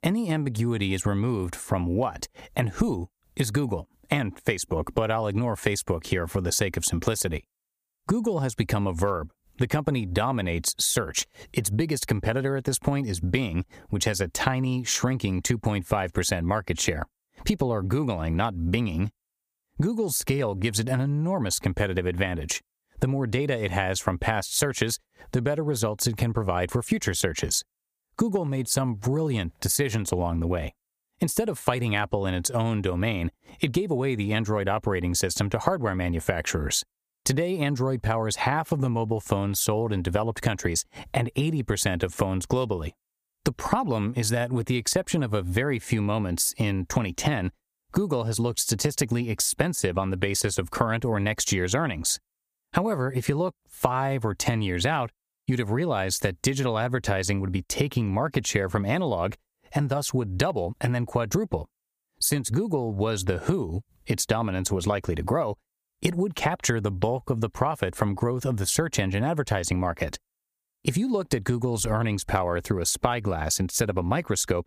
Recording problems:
squashed, flat; heavily

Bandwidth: 15 kHz